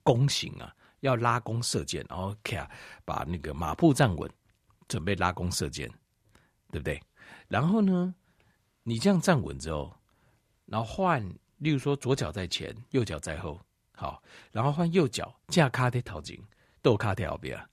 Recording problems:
none

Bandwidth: 14 kHz